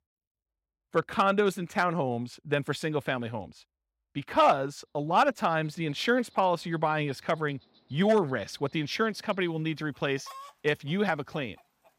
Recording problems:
animal sounds; faint; from 5.5 s on; 25 dB below the speech

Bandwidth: 16 kHz